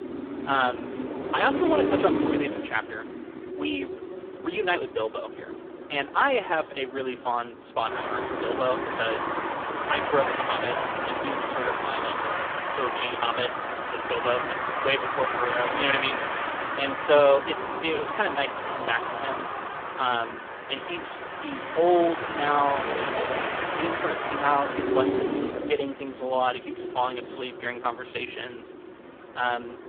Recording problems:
phone-call audio; poor line; nothing above 3.5 kHz
traffic noise; loud; throughout; 2 dB below the speech

